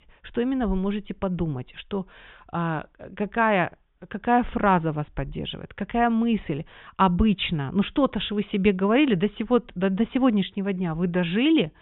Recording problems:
high frequencies cut off; severe; nothing above 3.5 kHz

